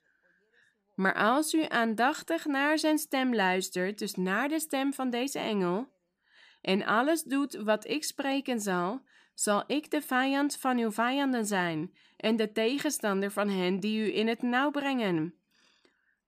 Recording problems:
none

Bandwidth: 15 kHz